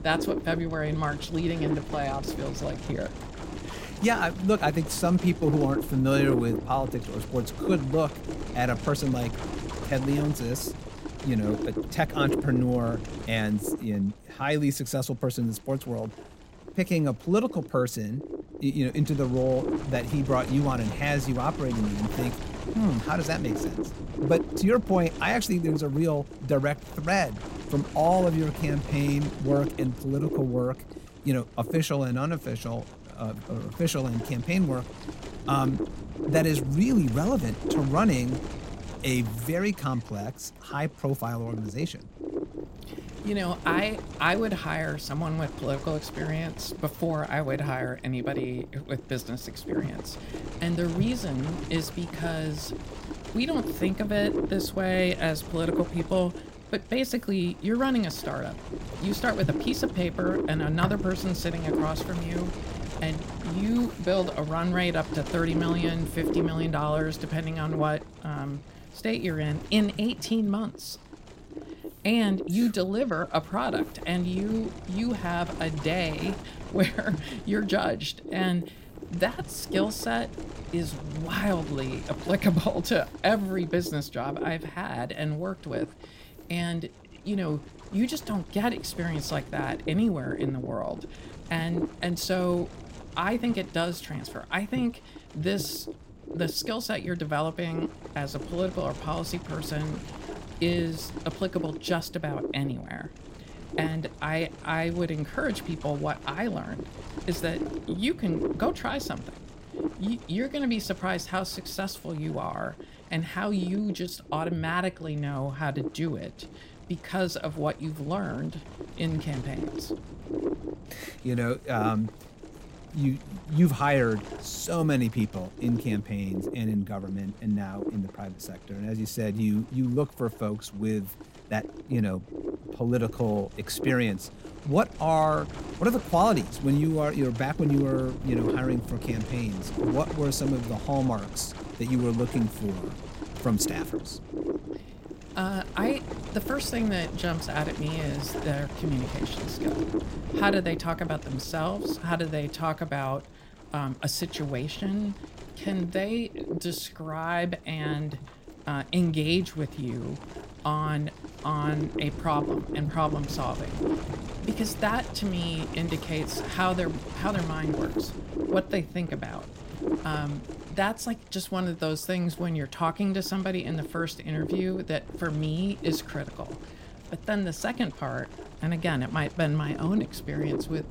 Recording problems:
wind noise on the microphone; heavy; 8 dB below the speech

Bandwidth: 16 kHz